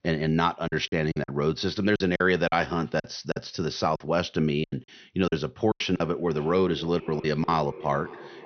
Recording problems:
echo of what is said; noticeable; from 6 s on; 560 ms later, 15 dB below the speech
high frequencies cut off; noticeable; nothing above 6 kHz
choppy; very; 11% of the speech affected

